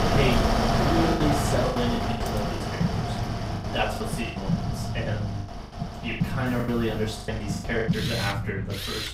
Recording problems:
off-mic speech; far
room echo; slight; dies away in 0.3 s
machinery noise; loud; throughout; 1 dB below the speech
train or aircraft noise; loud; throughout; 2 dB below the speech
low rumble; noticeable; throughout; 10 dB below the speech
choppy; very; 10% of the speech affected

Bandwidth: 15.5 kHz